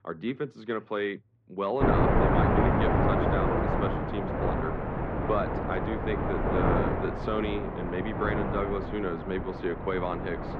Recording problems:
muffled; very; fading above 2 kHz
wind noise on the microphone; heavy; from 2 s on; 3 dB above the speech

